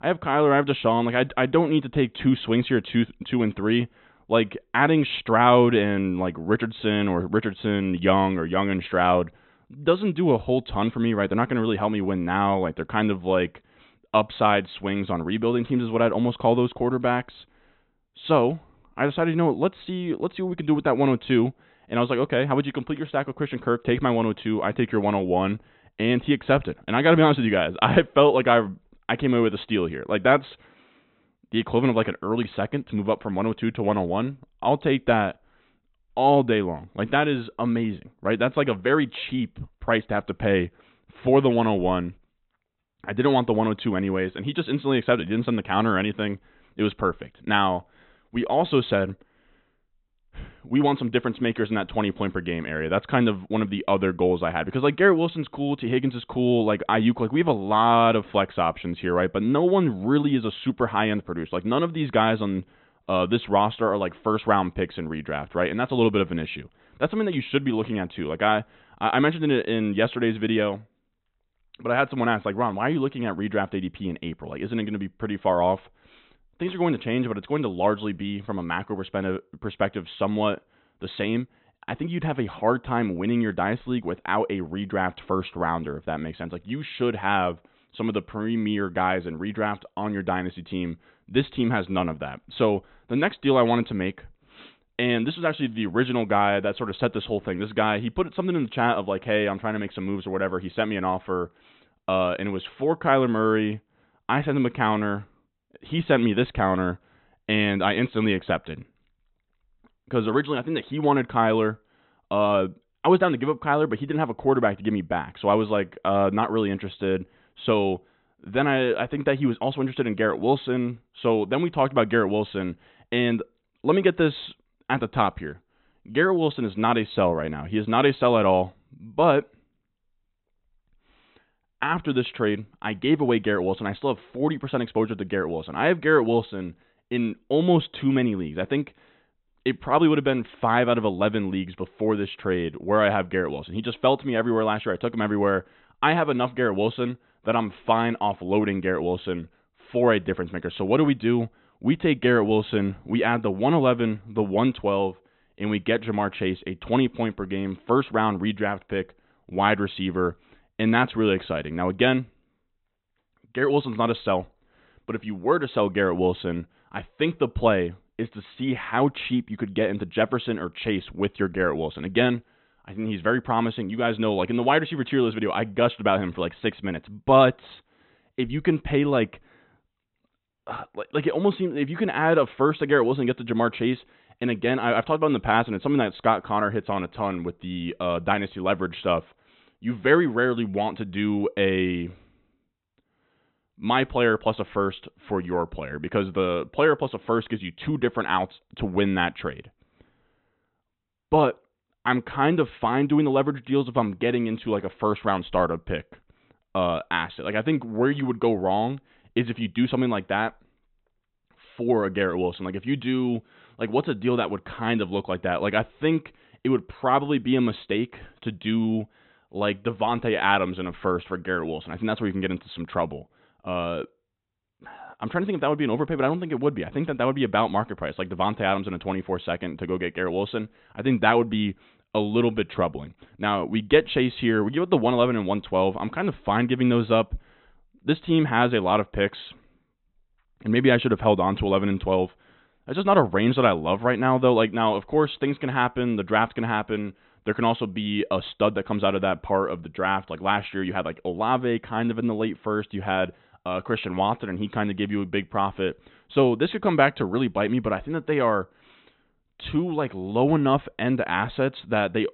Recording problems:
high frequencies cut off; severe; nothing above 4 kHz

